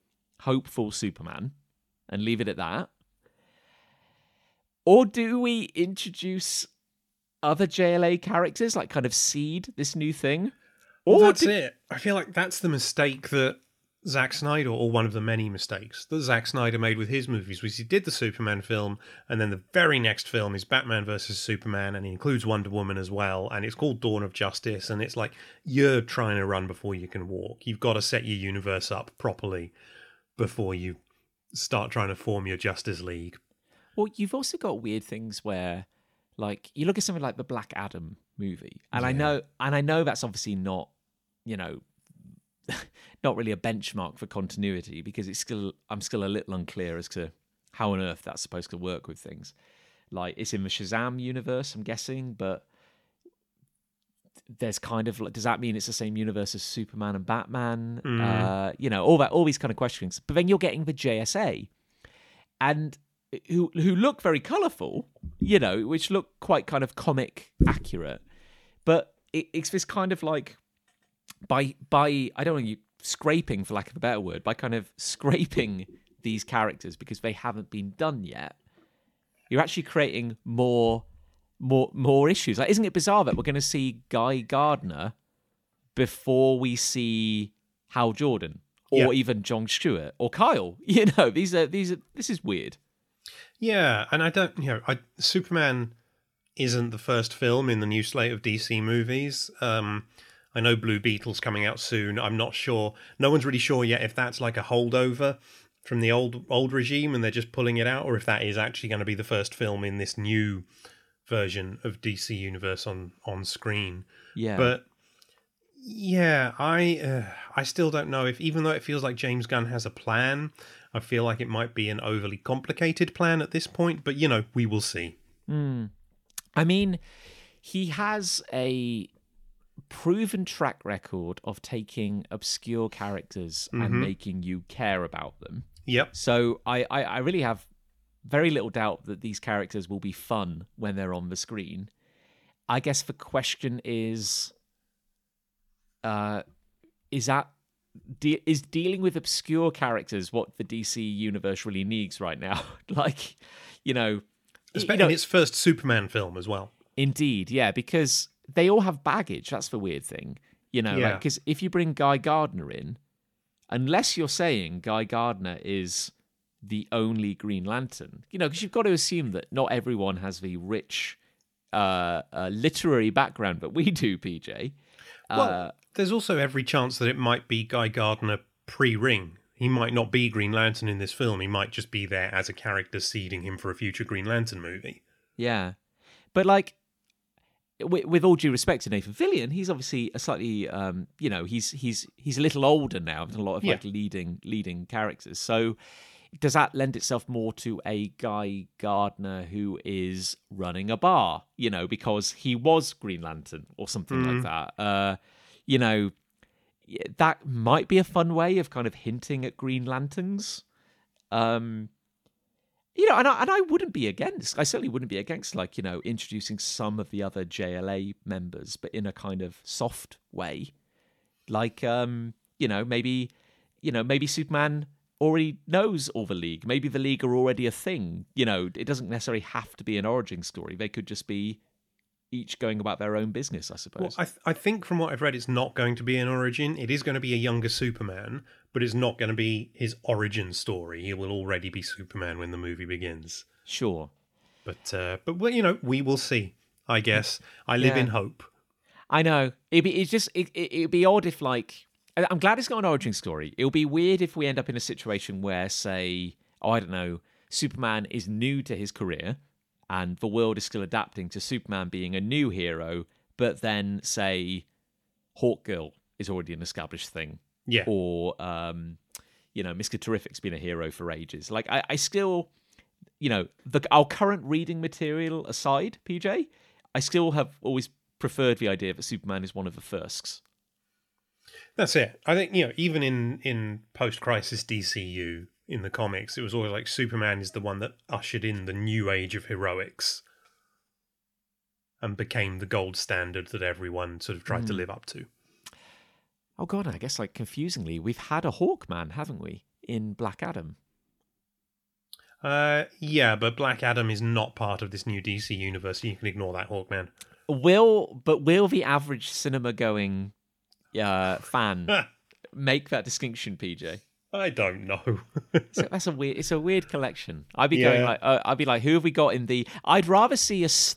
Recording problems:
none

